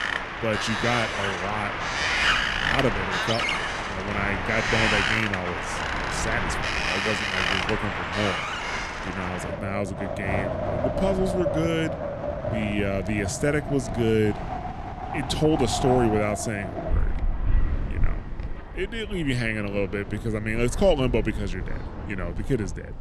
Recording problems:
wind in the background; loud; throughout; as loud as the speech

